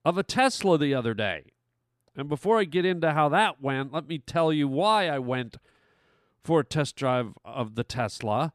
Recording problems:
none

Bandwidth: 14.5 kHz